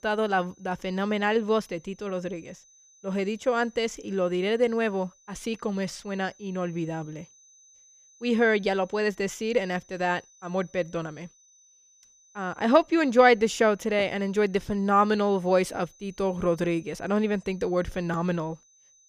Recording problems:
high-pitched whine; faint; throughout; 6 kHz, 30 dB below the speech

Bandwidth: 14.5 kHz